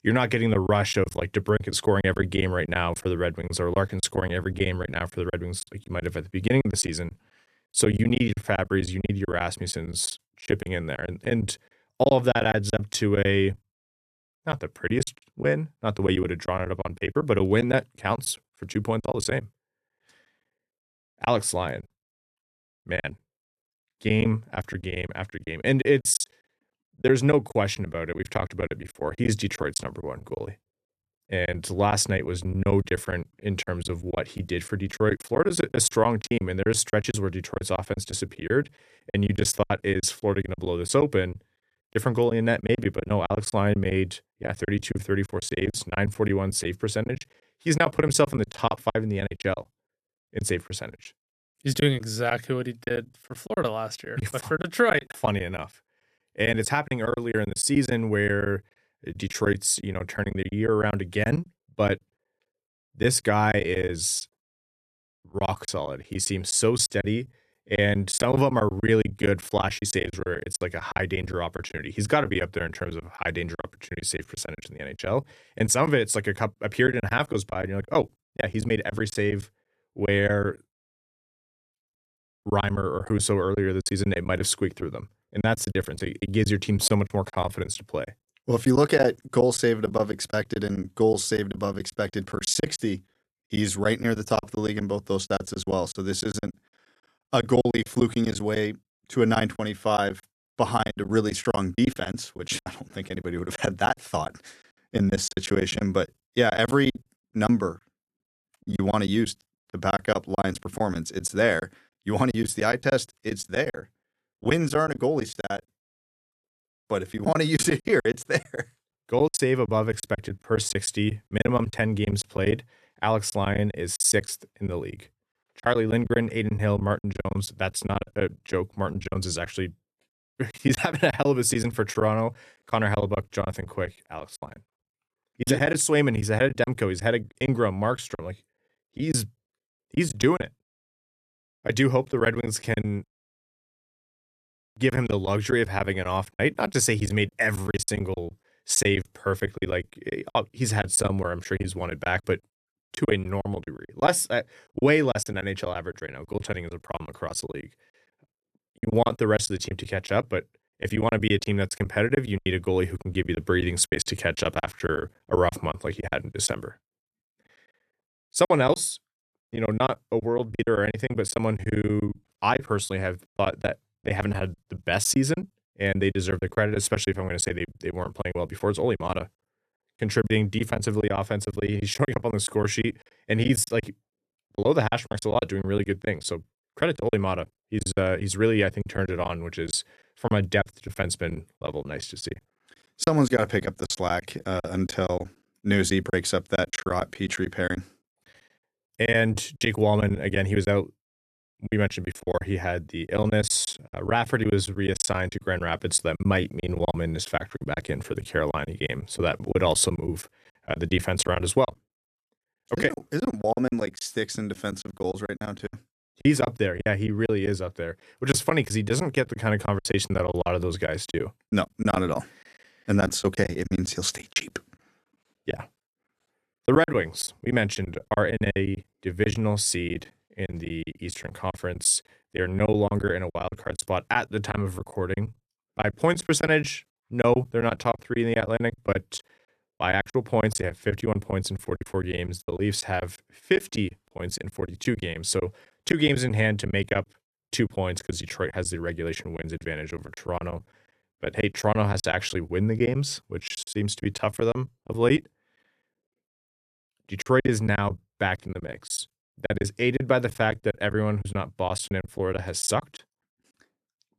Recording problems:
choppy; very; 14% of the speech affected

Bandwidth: 14 kHz